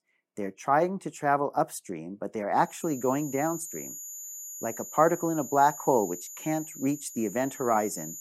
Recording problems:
high-pitched whine; noticeable; from 2.5 s on; 7 kHz, 10 dB below the speech

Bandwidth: 16 kHz